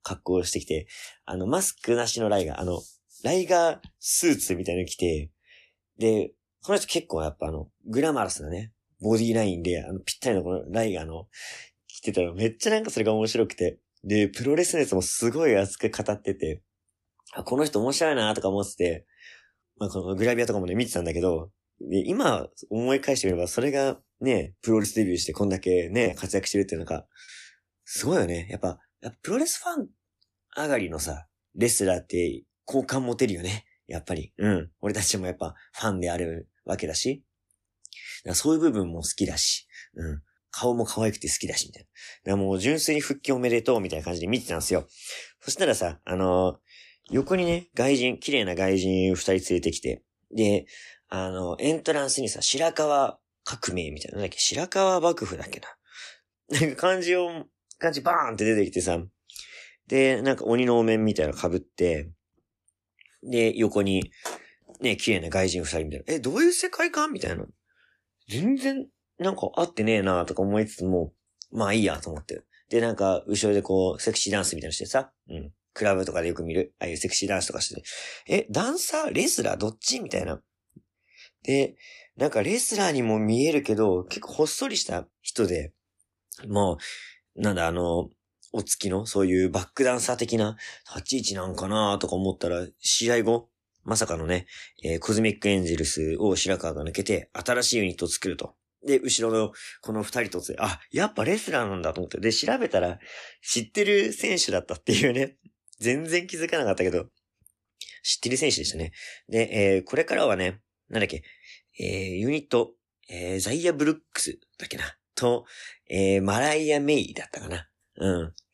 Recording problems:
choppy; occasionally; from 24 to 28 s; 4% of the speech affected

